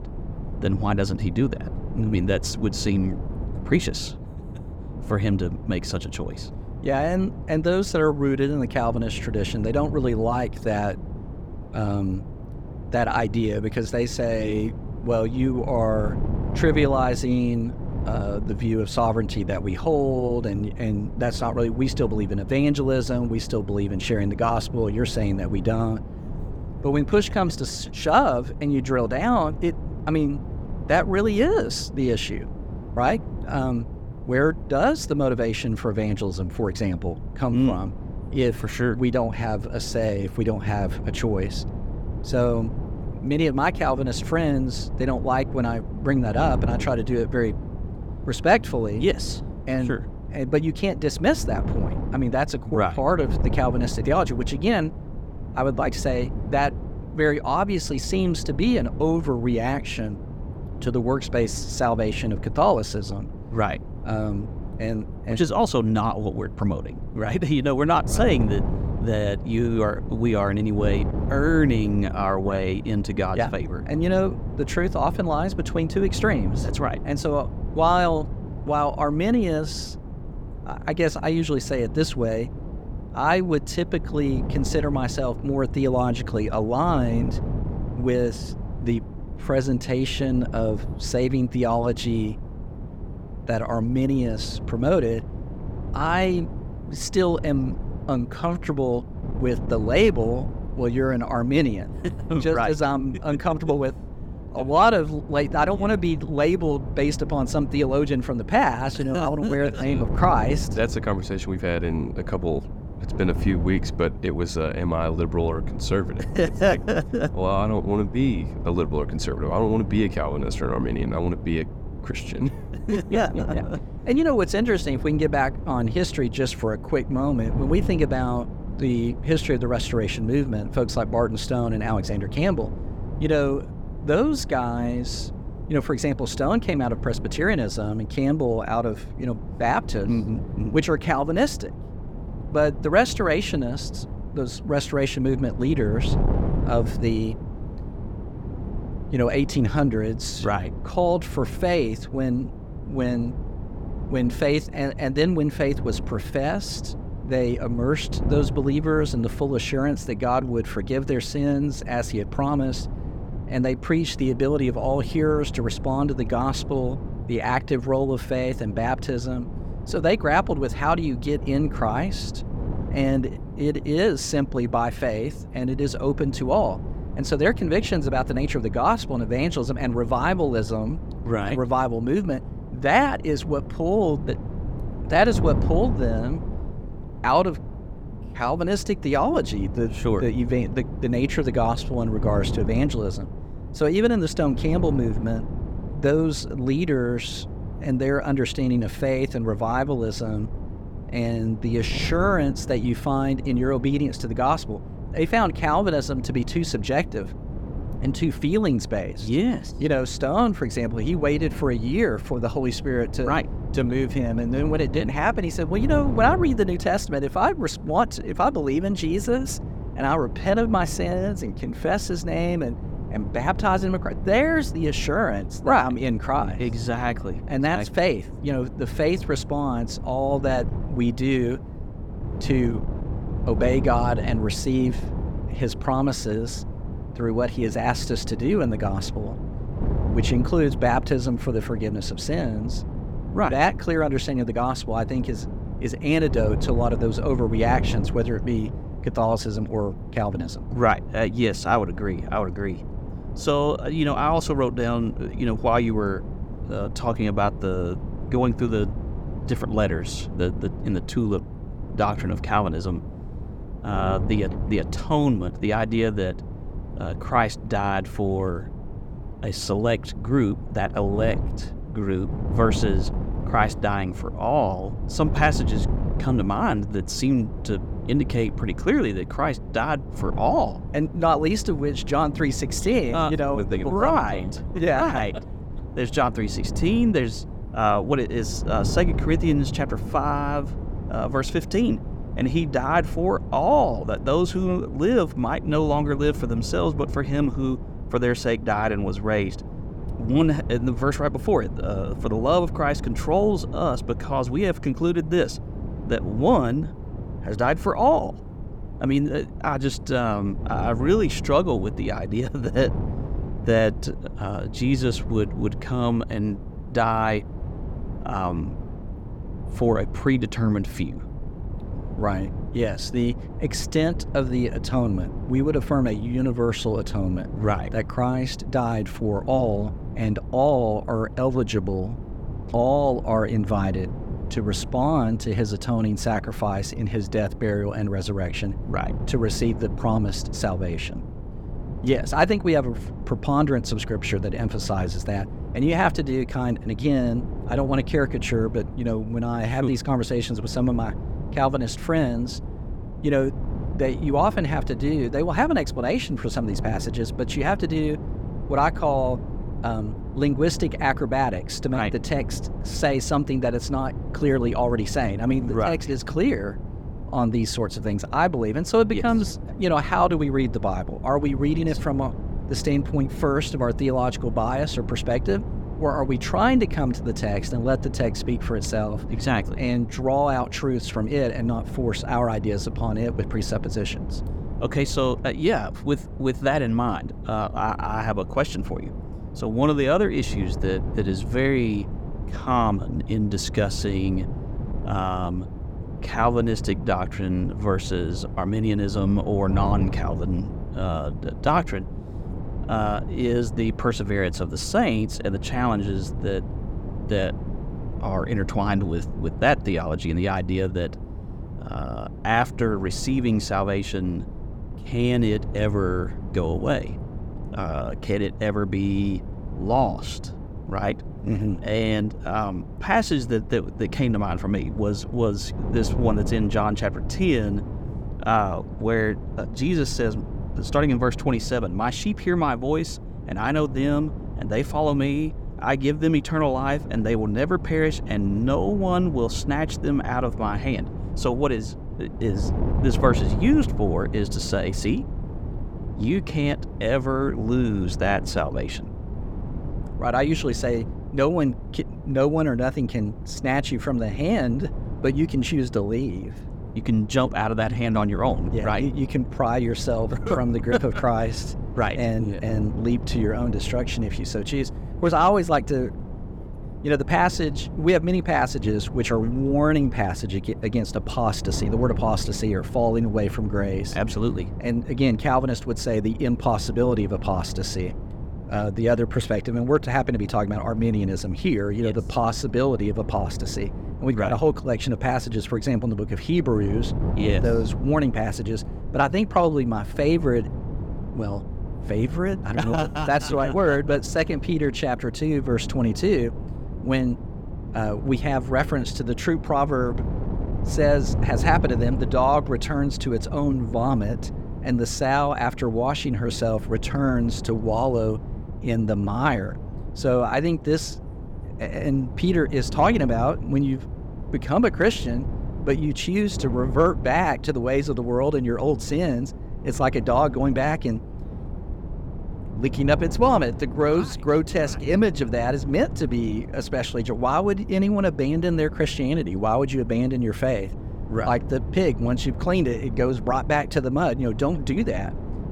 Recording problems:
wind noise on the microphone; occasional gusts; 15 dB below the speech

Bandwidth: 17.5 kHz